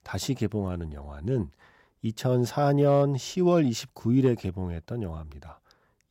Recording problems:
none

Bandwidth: 16 kHz